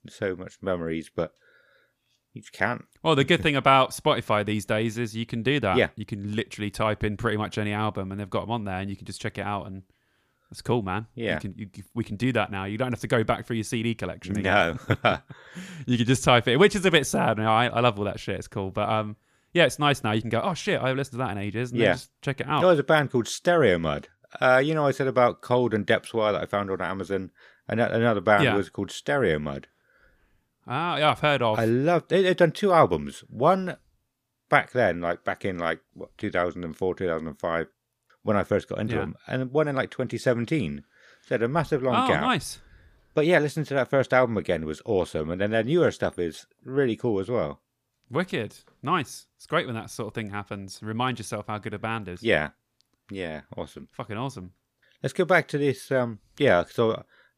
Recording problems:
none

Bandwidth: 15 kHz